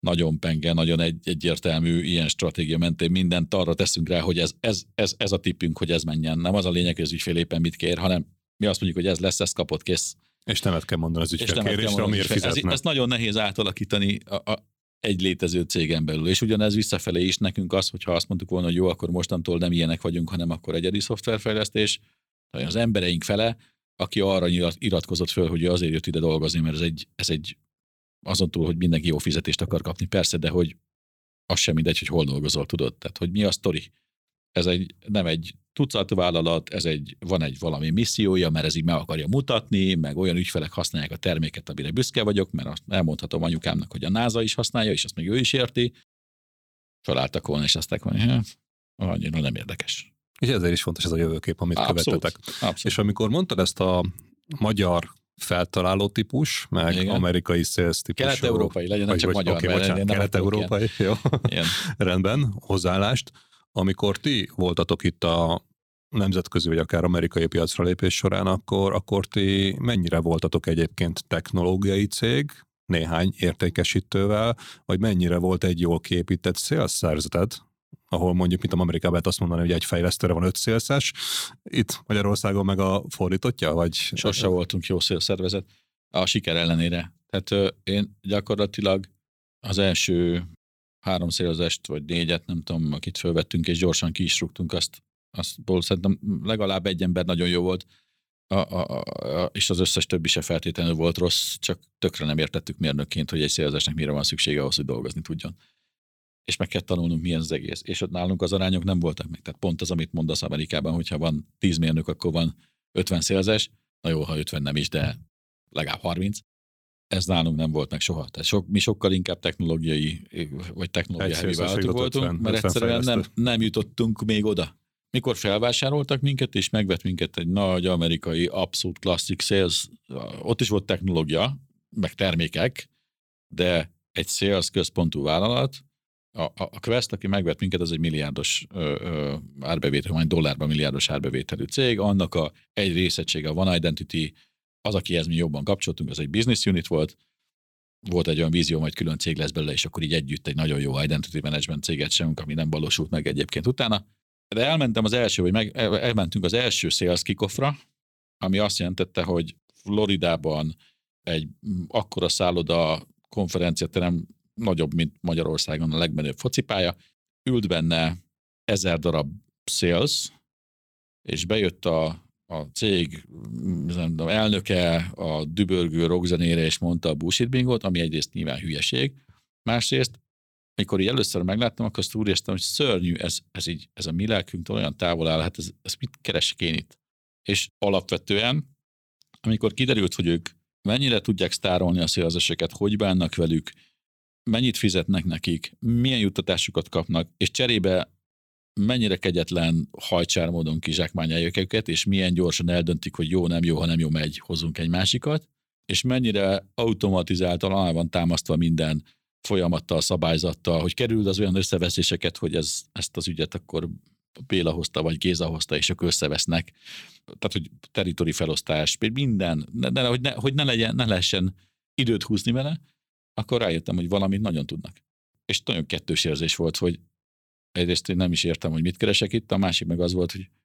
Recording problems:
none

